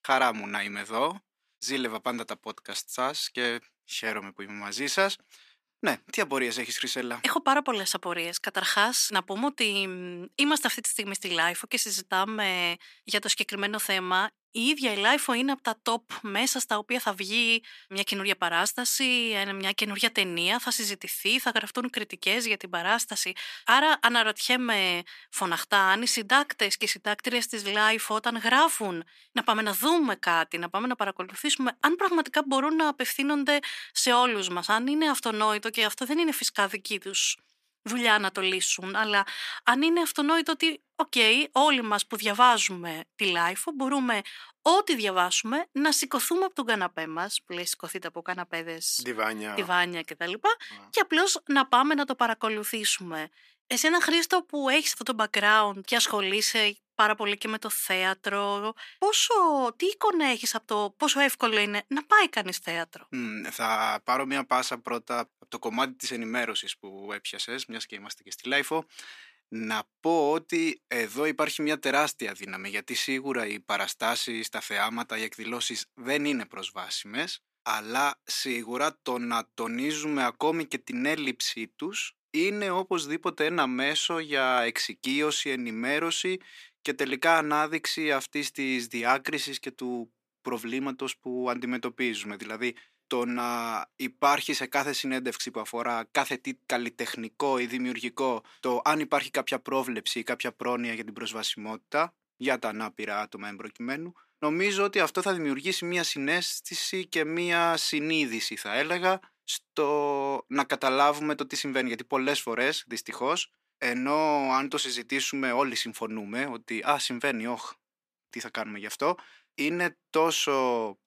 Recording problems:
thin; somewhat; fading below 350 Hz

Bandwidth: 14.5 kHz